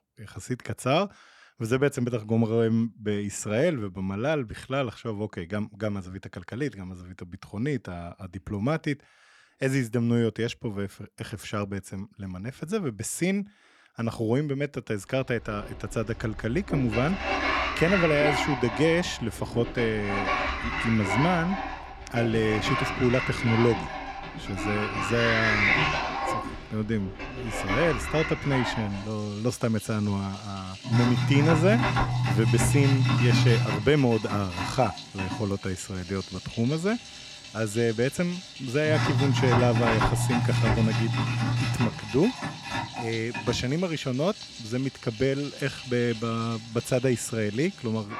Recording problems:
household noises; very loud; from 15 s on; as loud as the speech

